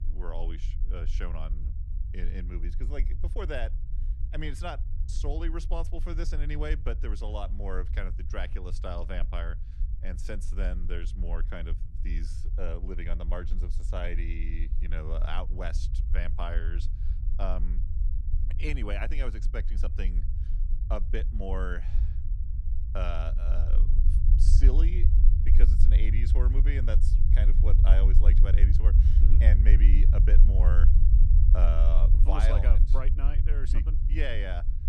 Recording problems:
low rumble; loud; throughout; 8 dB below the speech

